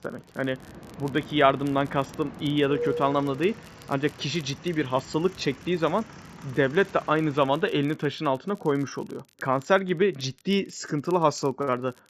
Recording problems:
high frequencies cut off; noticeable; nothing above 8 kHz
train or aircraft noise; noticeable; until 7.5 s; 15 dB below the speech
crackle, like an old record; faint; 30 dB below the speech

